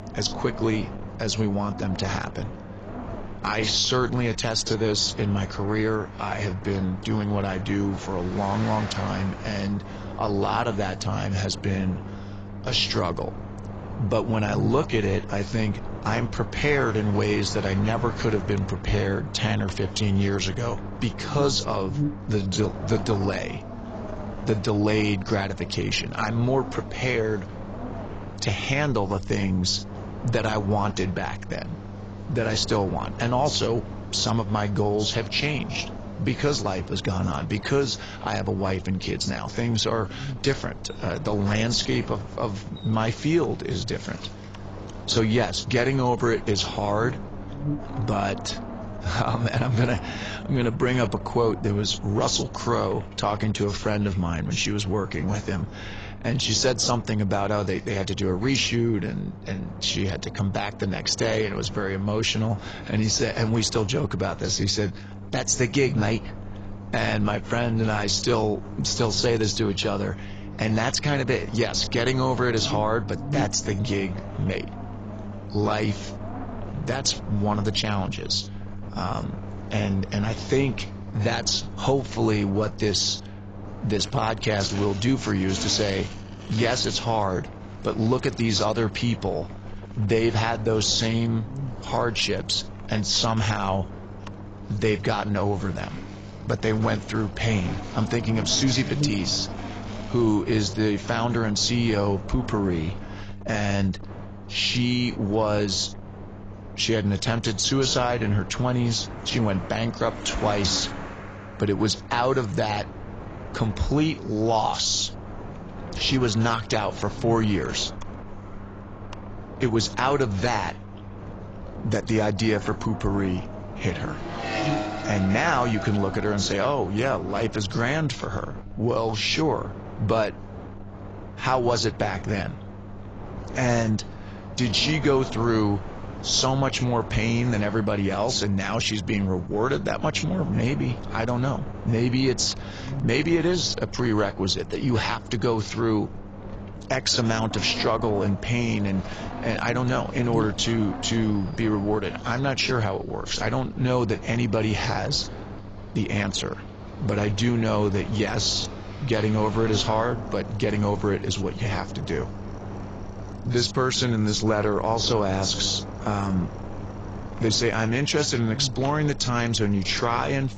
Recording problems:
garbled, watery; badly; nothing above 7.5 kHz
traffic noise; noticeable; throughout; 20 dB below the speech
wind noise on the microphone; occasional gusts; 15 dB below the speech
electrical hum; faint; throughout; 50 Hz, 25 dB below the speech

